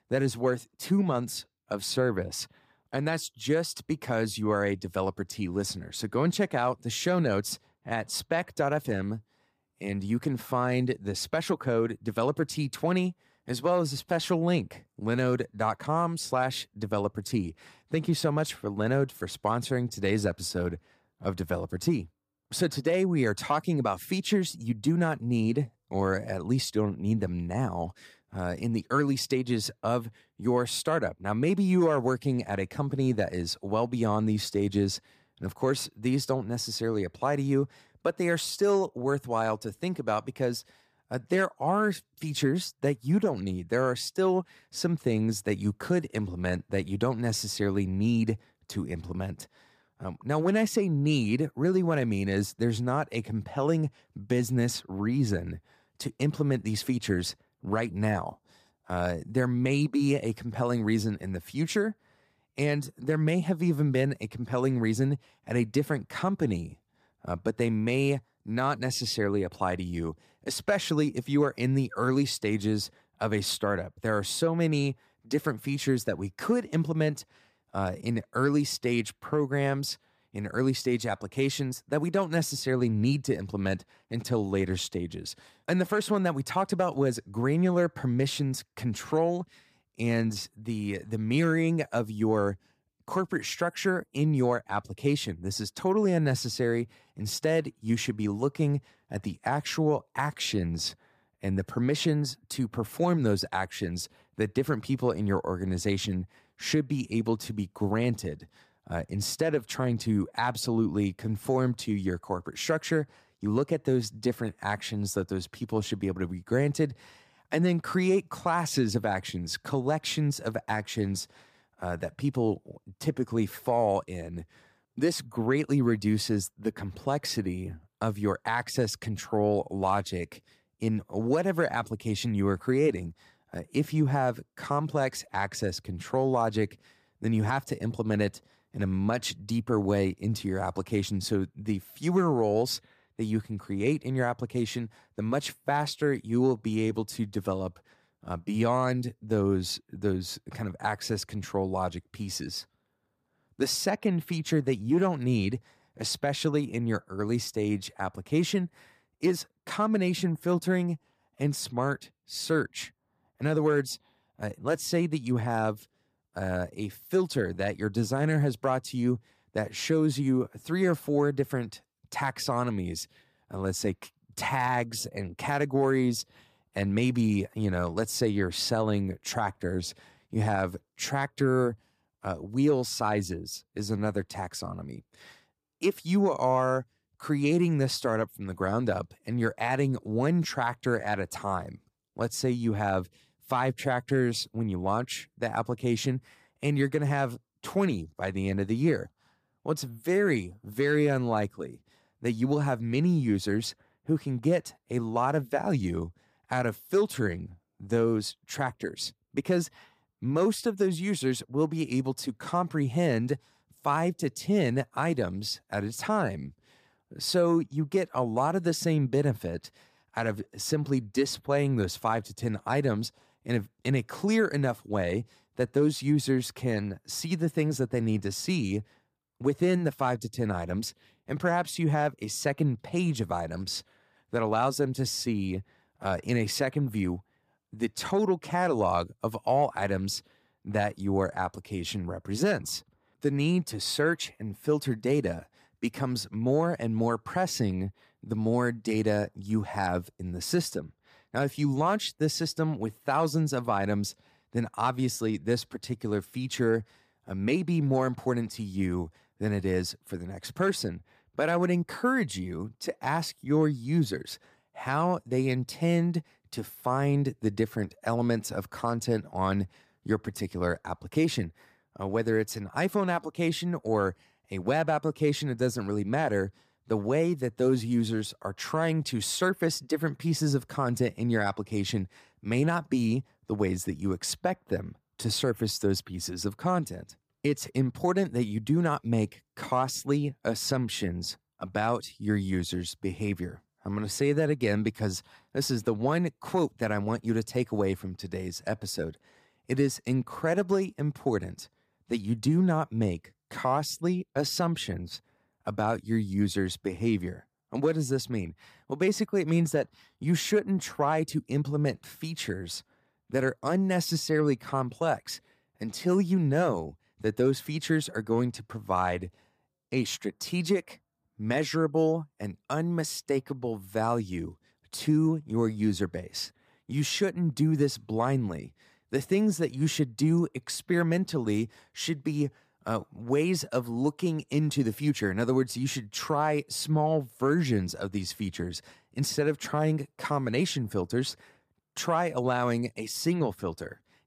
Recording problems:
none

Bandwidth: 14.5 kHz